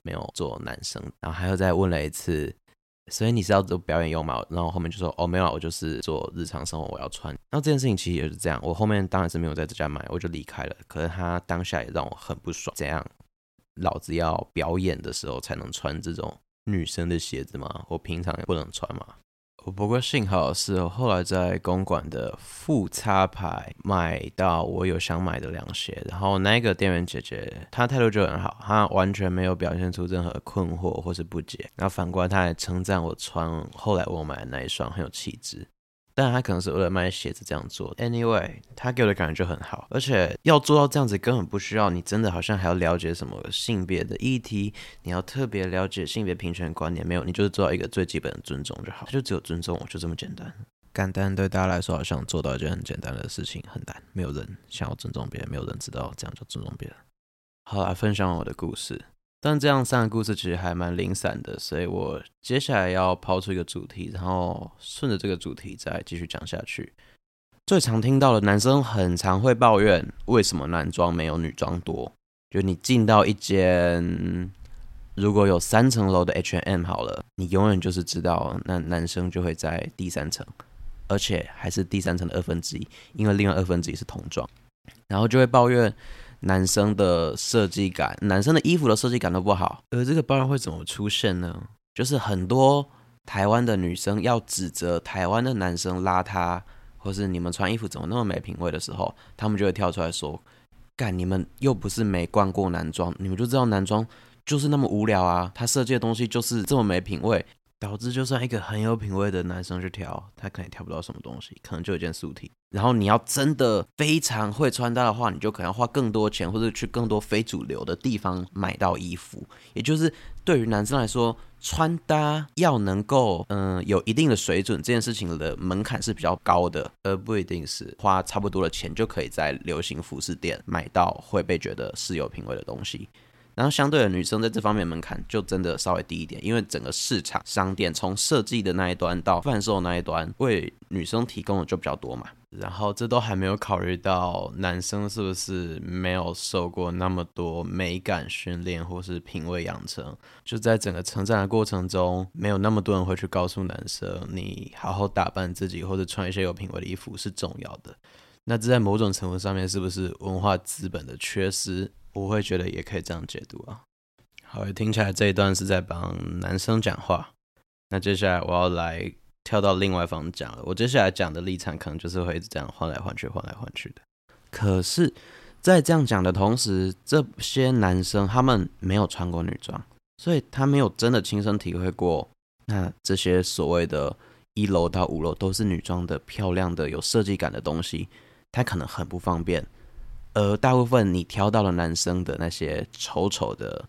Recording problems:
none

